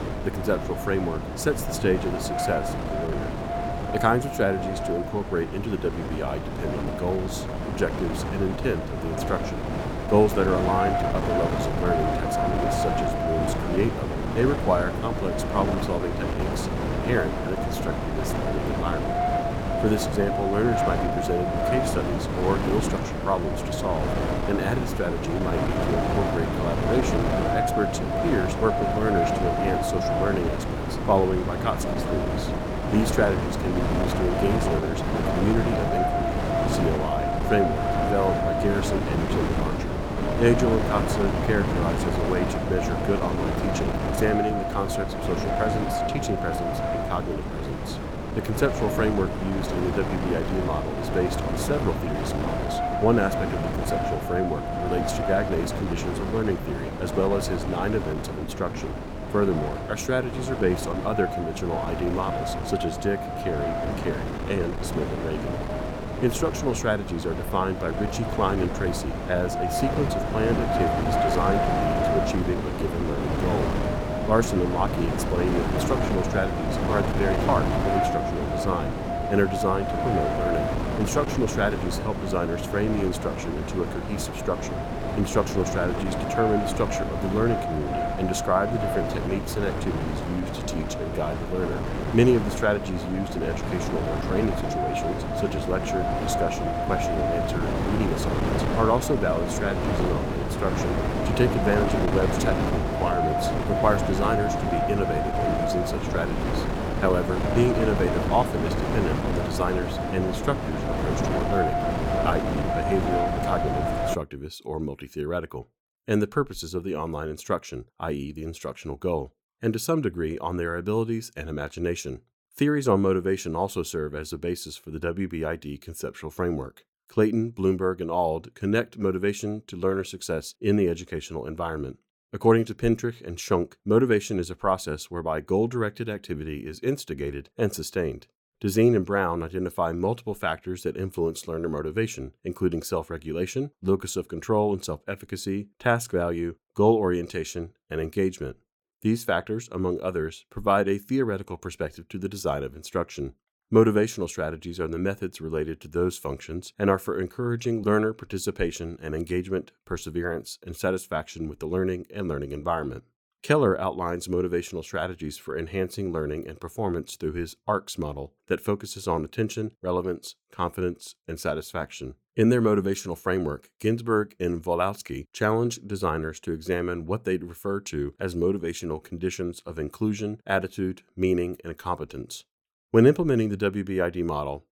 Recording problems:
wind noise on the microphone; heavy; until 1:54; as loud as the speech

